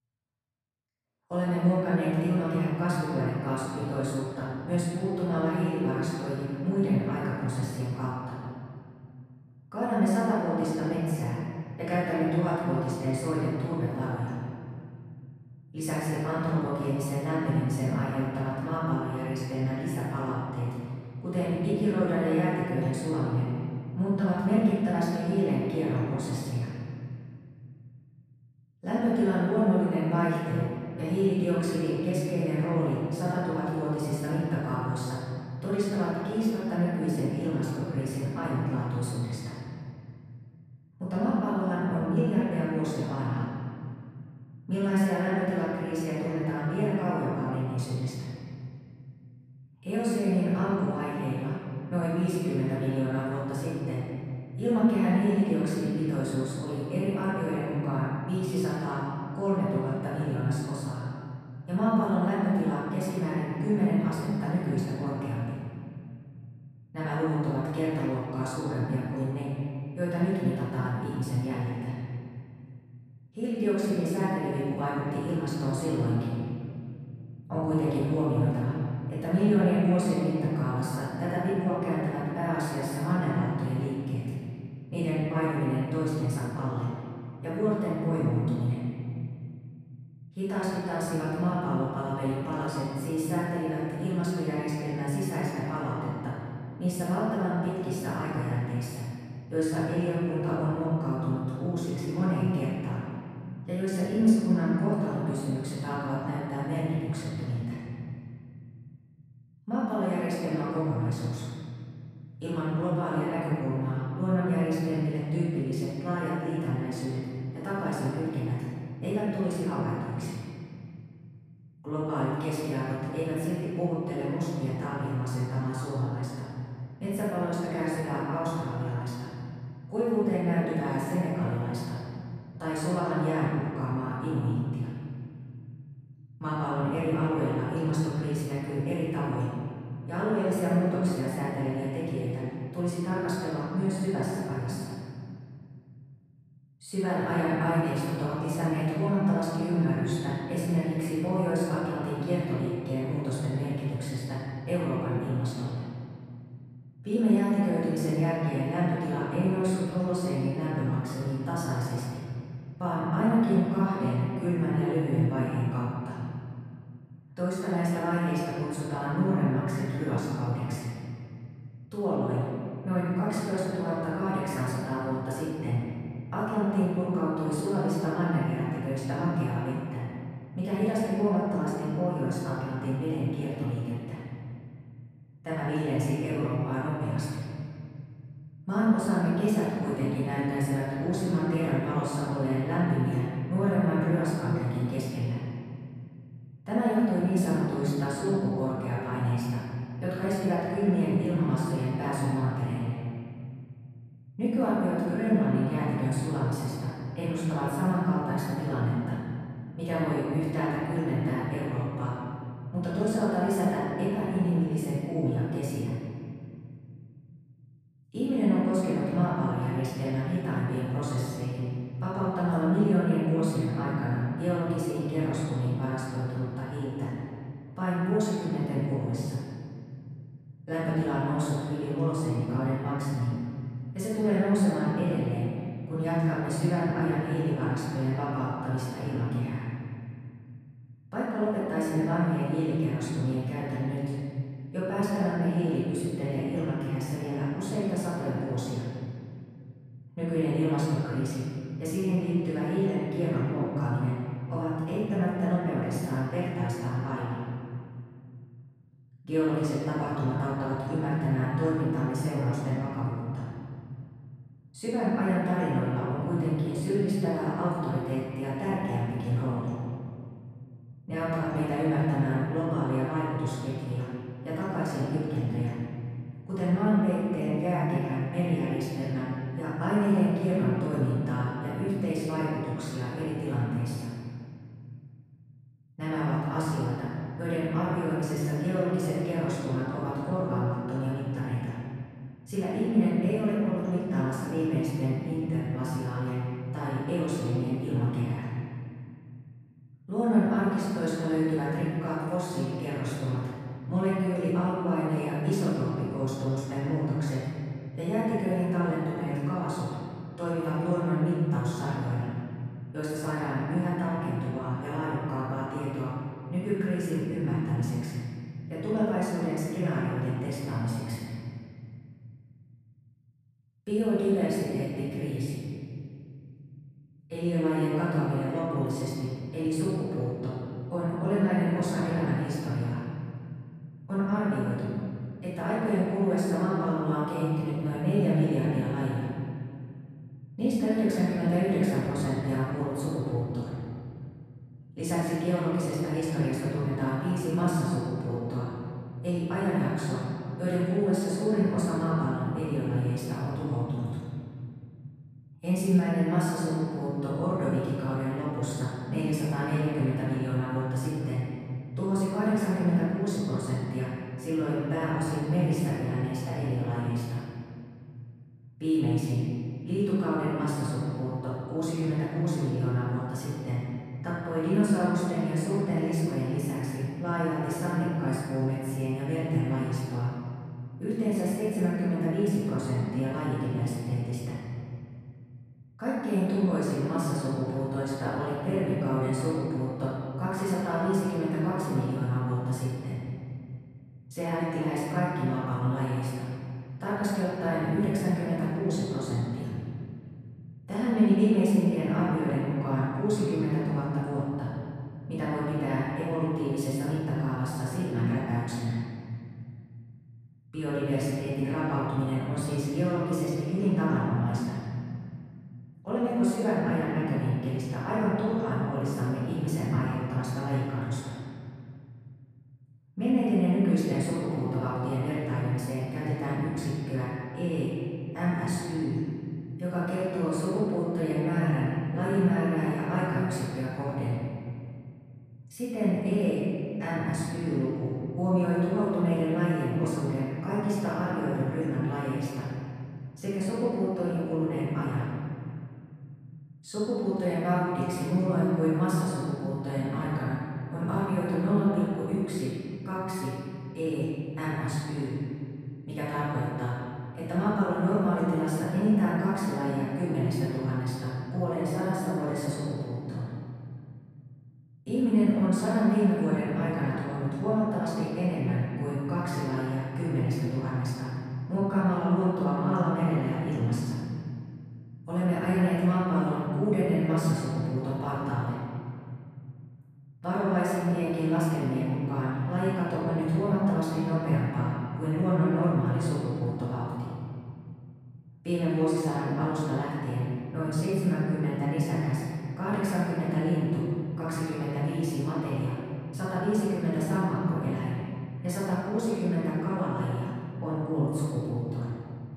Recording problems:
room echo; strong; dies away in 2.4 s
off-mic speech; far

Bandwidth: 14.5 kHz